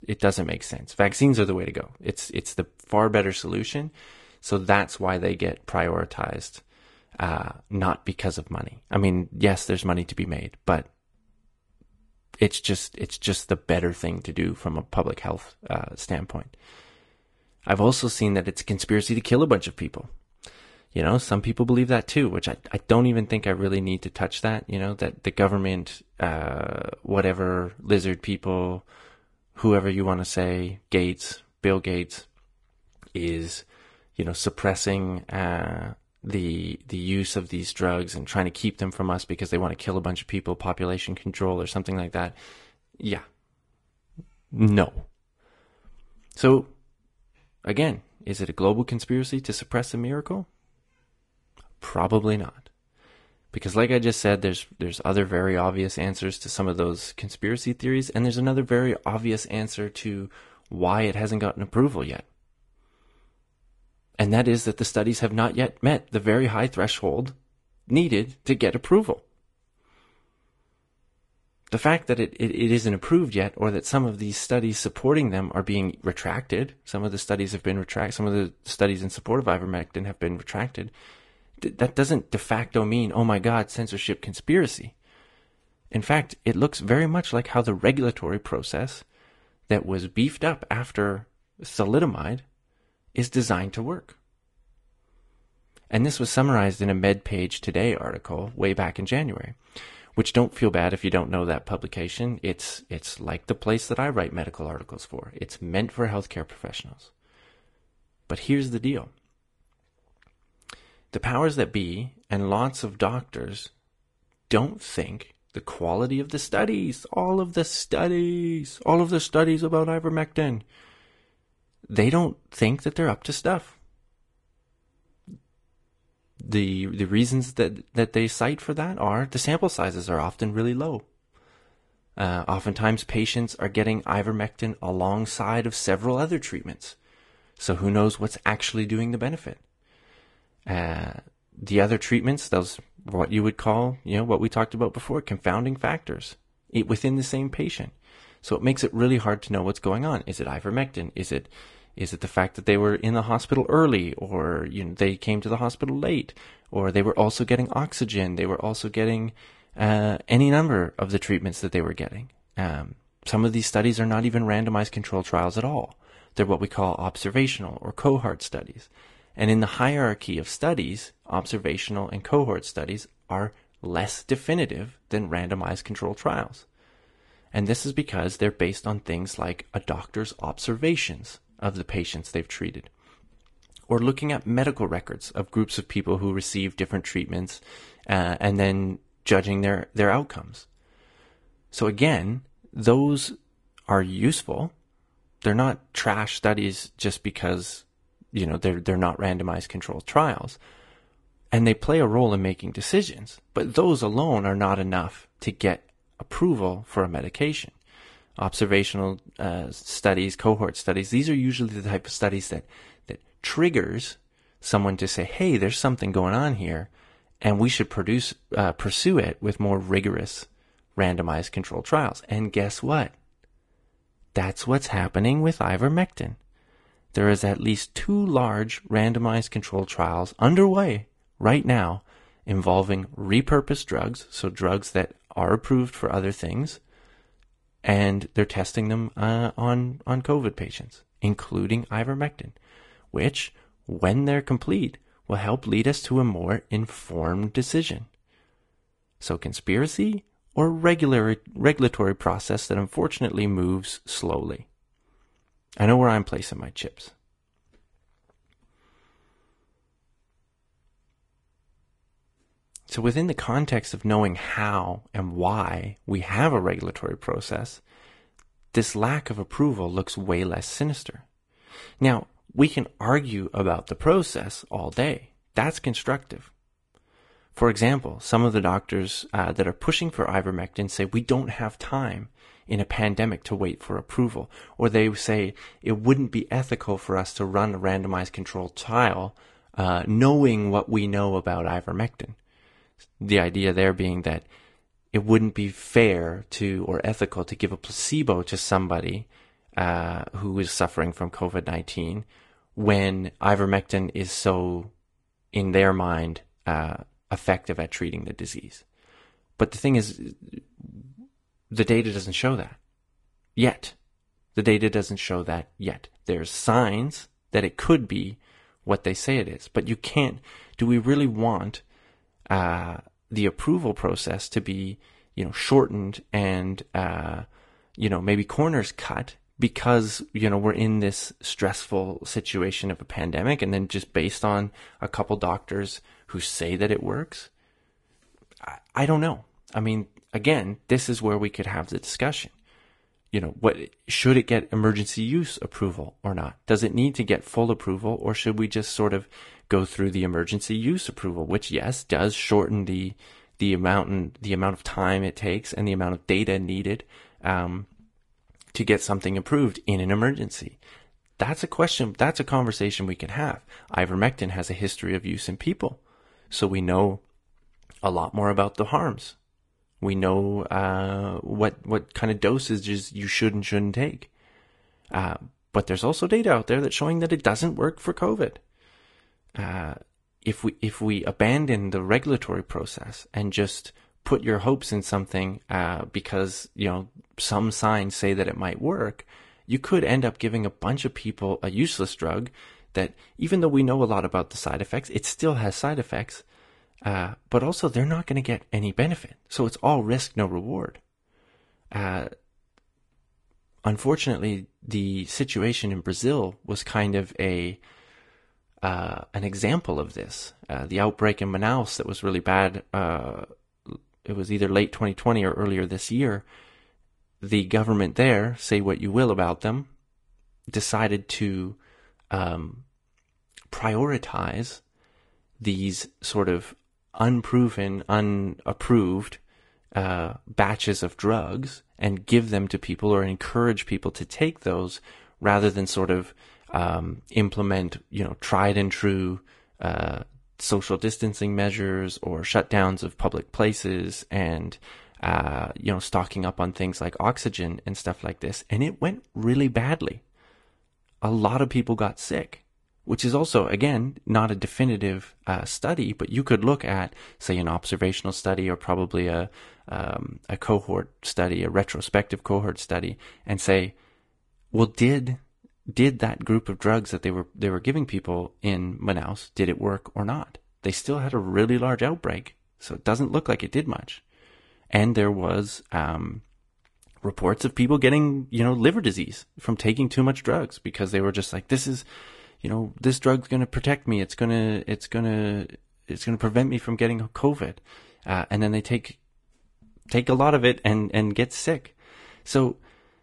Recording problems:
garbled, watery; slightly; nothing above 10.5 kHz

